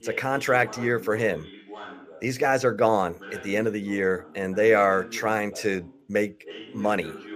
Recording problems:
voice in the background; noticeable; throughout; 15 dB below the speech

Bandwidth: 15 kHz